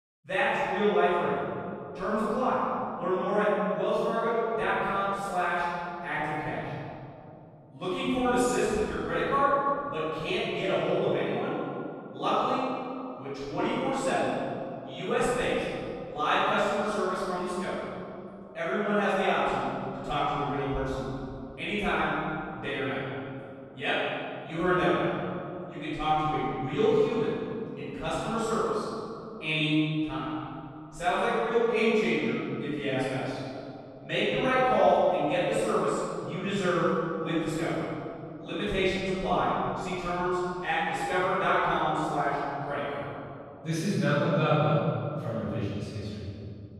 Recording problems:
room echo; strong; dies away in 2.6 s
off-mic speech; far

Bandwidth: 14 kHz